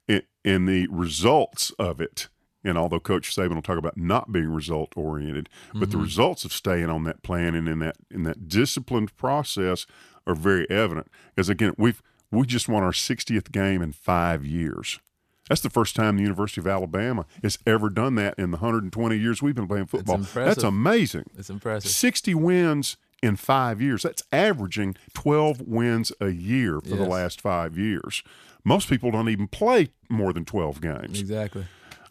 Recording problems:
none

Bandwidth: 14.5 kHz